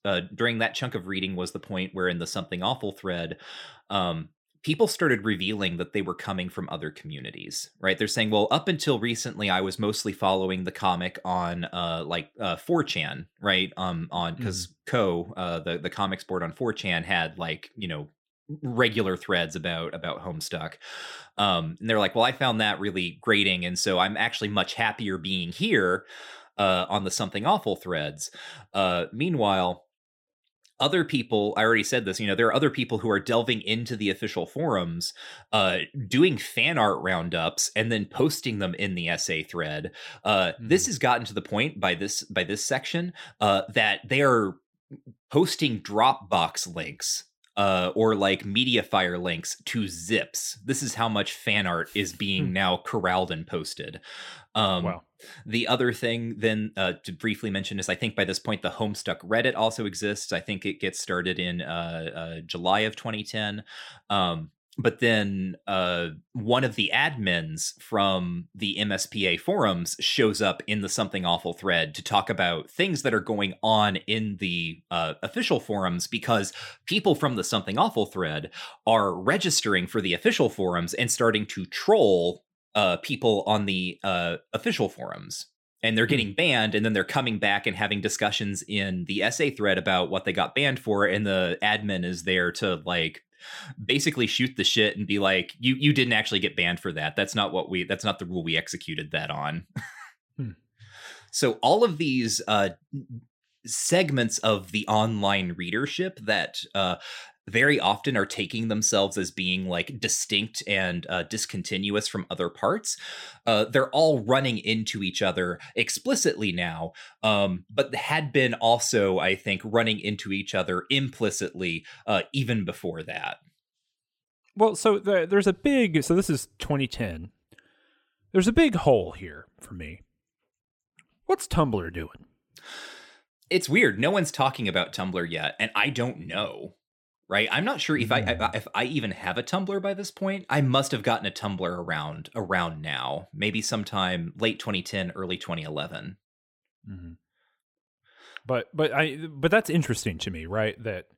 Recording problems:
none

